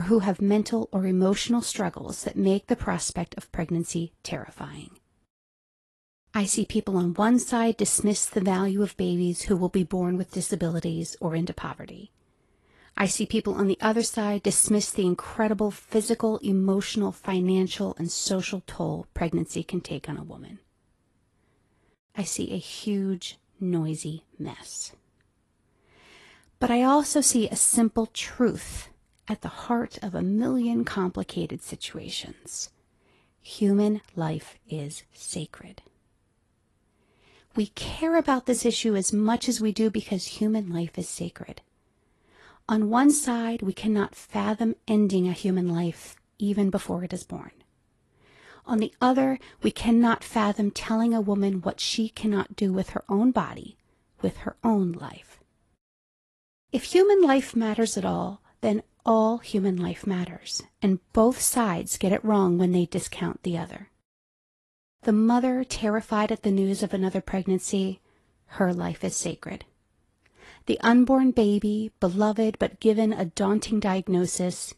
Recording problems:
garbled, watery; slightly; nothing above 11 kHz
abrupt cut into speech; at the start

